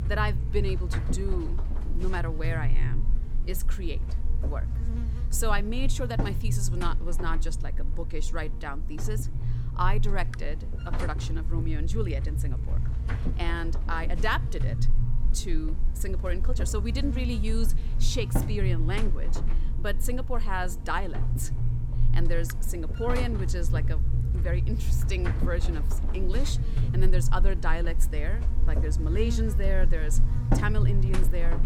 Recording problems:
electrical hum; very faint; throughout; 60 Hz, 8 dB below the speech

